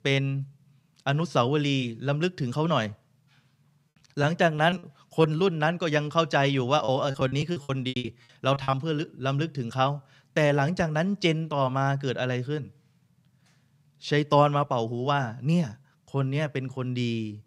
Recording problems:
choppy; very; from 4 to 5.5 s and from 7 to 9 s; 20% of the speech affected

